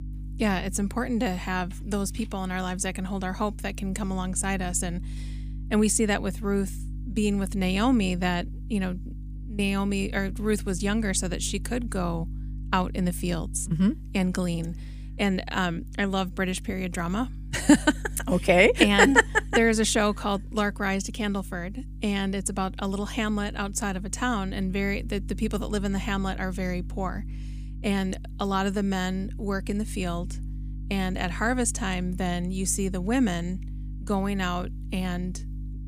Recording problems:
electrical hum; faint; throughout; 50 Hz, 25 dB below the speech

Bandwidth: 15 kHz